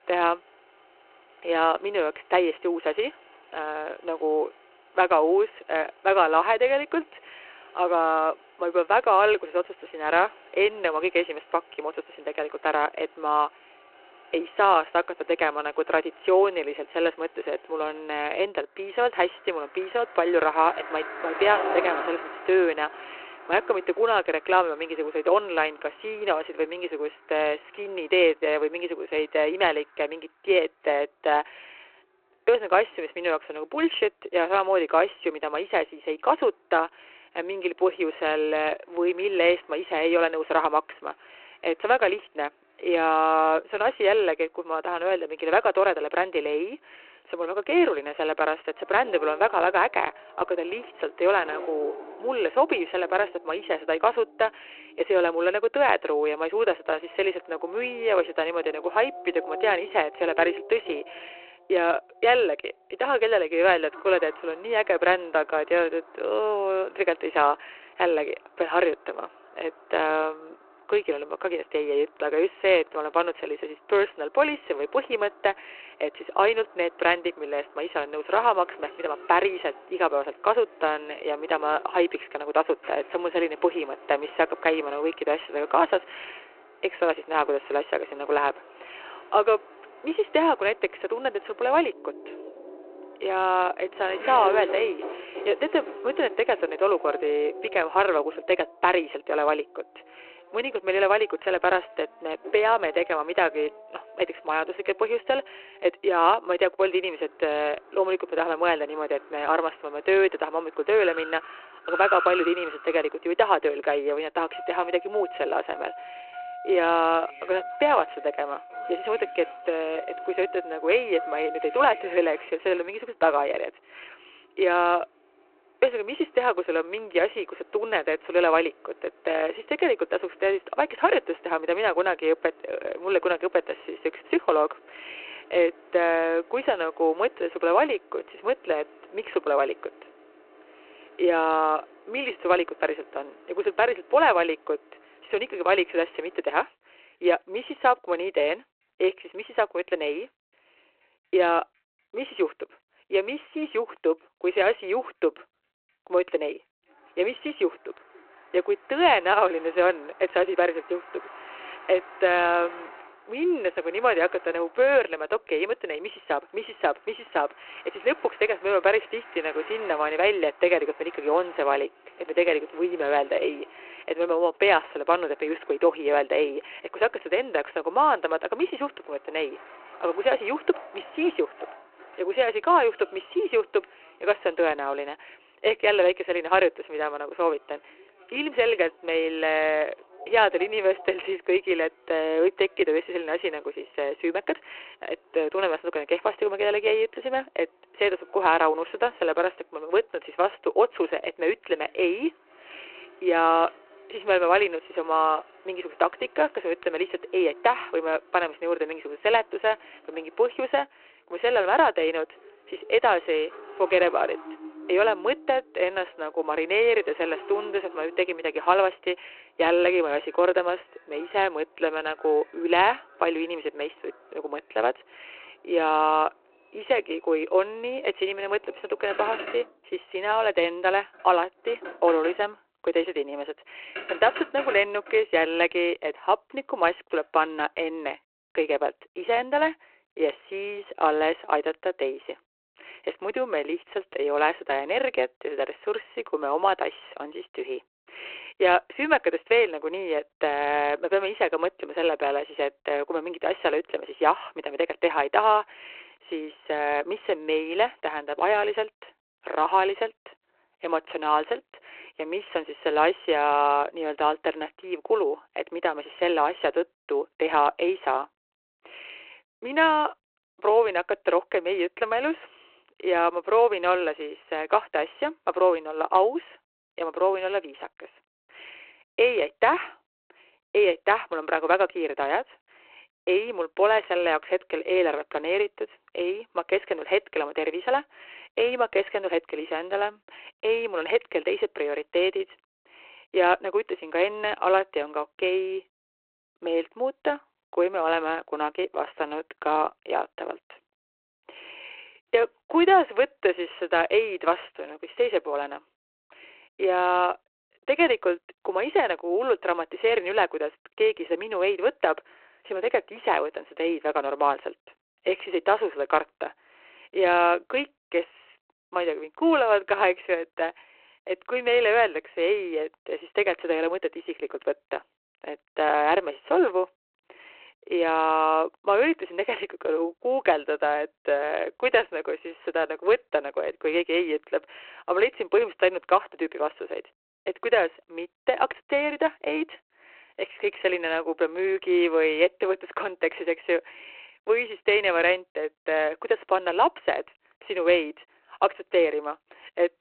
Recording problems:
phone-call audio
traffic noise; noticeable; until 3:57; 15 dB below the speech

